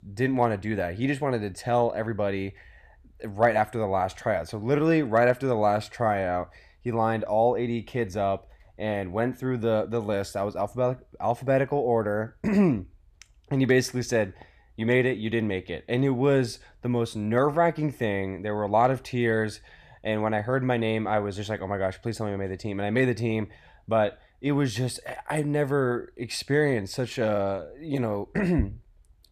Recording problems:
none

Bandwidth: 14.5 kHz